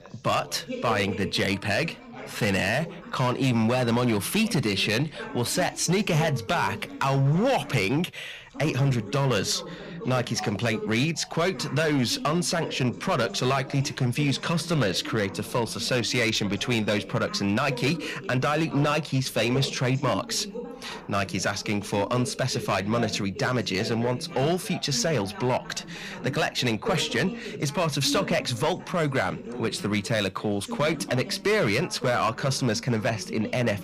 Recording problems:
distortion; slight; 7% of the sound clipped
background chatter; noticeable; throughout; 2 voices, 15 dB below the speech

